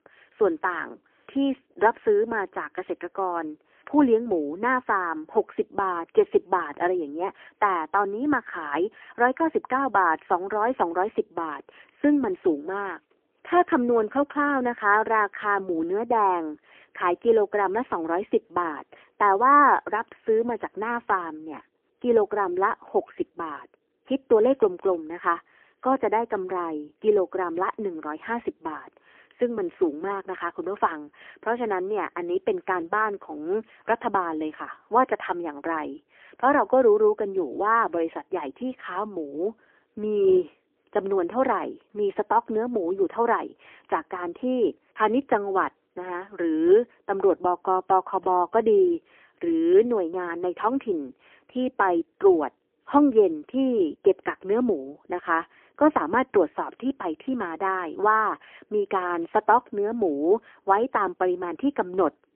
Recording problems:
phone-call audio; poor line; nothing above 3 kHz

